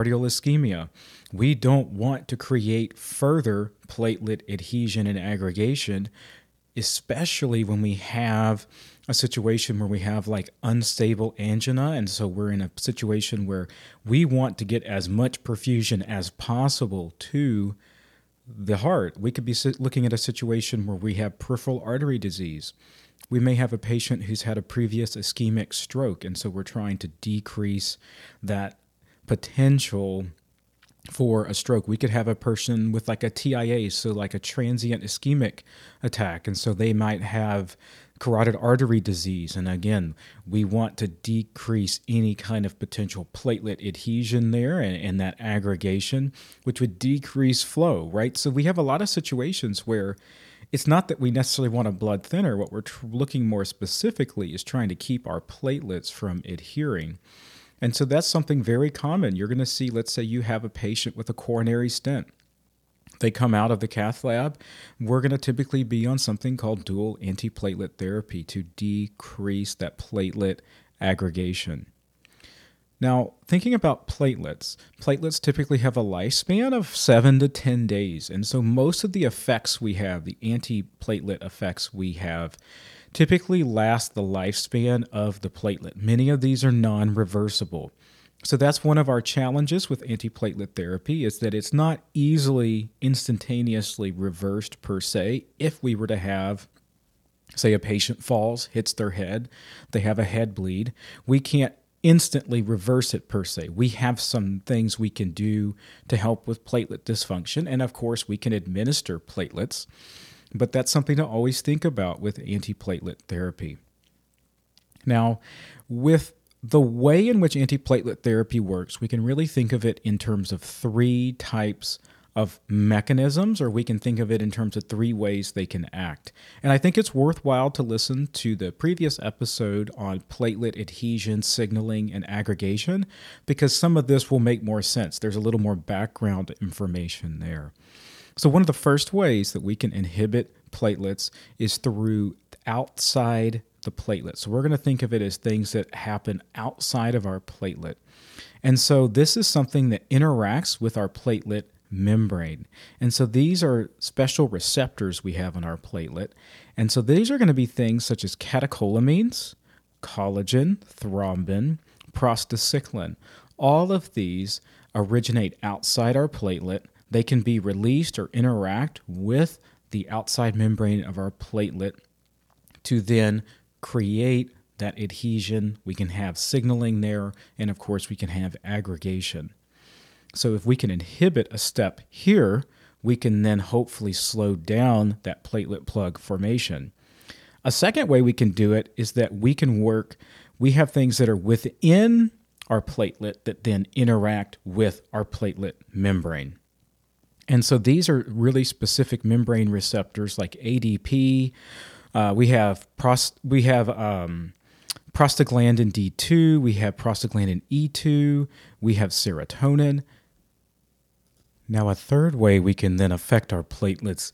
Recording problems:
abrupt cut into speech; at the start

